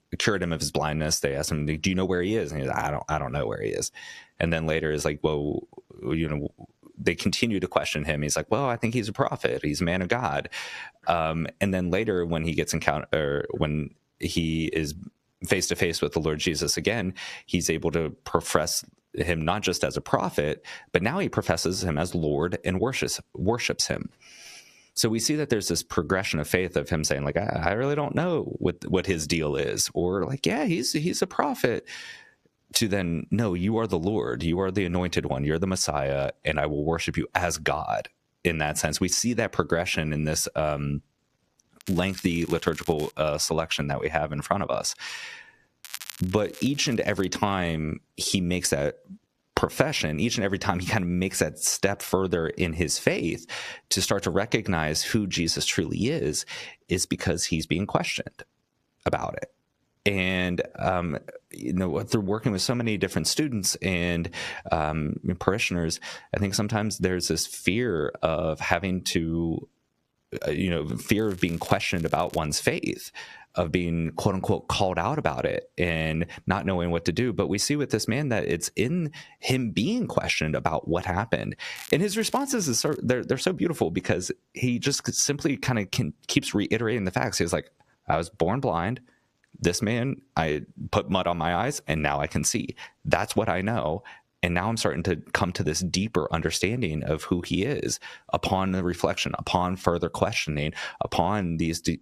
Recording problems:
squashed, flat; somewhat
crackling; noticeable; 4 times, first at 42 s; 20 dB below the speech

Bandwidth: 14.5 kHz